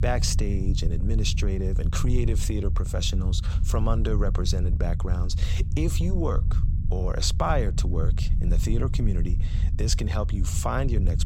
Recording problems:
low rumble; noticeable; throughout; 10 dB below the speech

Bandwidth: 16 kHz